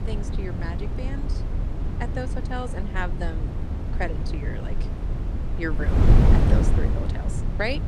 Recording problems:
wind noise on the microphone; heavy; 1 dB below the speech

